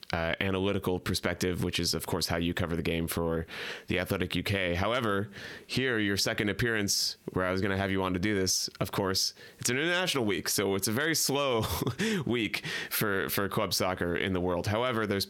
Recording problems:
squashed, flat; heavily

